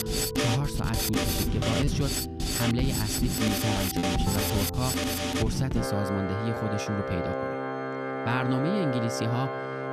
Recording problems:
background music; very loud; throughout; 2 dB above the speech
choppy; occasionally; from 4 to 7 s; 3% of the speech affected

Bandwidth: 14.5 kHz